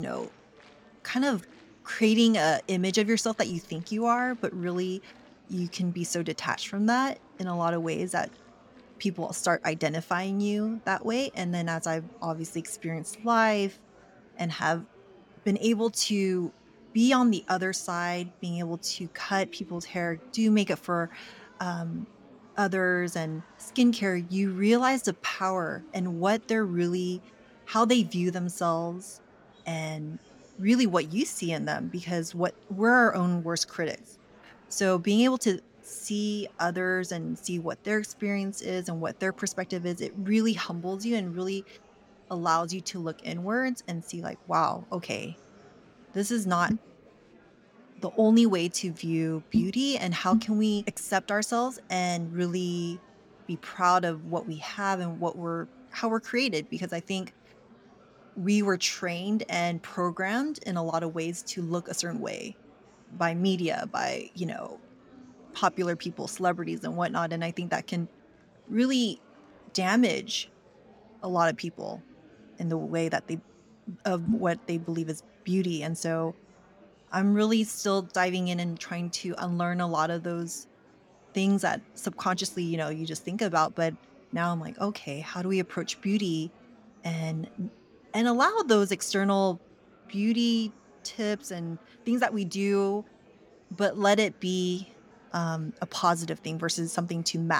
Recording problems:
murmuring crowd; faint; throughout; 25 dB below the speech
abrupt cut into speech; at the start and the end

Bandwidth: 18 kHz